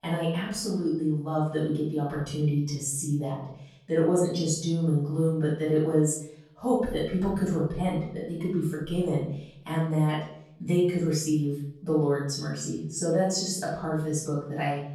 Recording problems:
off-mic speech; far
room echo; noticeable; dies away in 0.6 s

